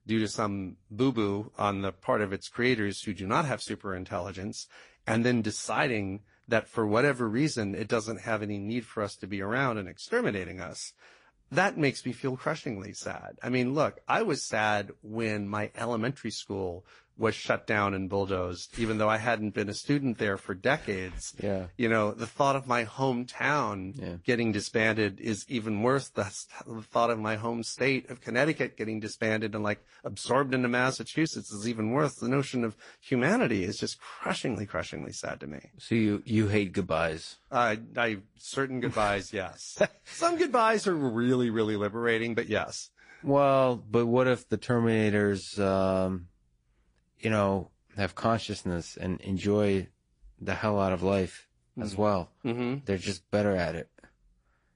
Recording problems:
garbled, watery; slightly; nothing above 10.5 kHz

